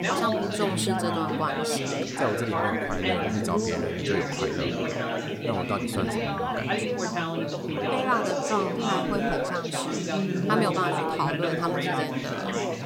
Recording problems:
chatter from many people; very loud; throughout; 3 dB above the speech
hiss; faint; throughout; 30 dB below the speech

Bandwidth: 16 kHz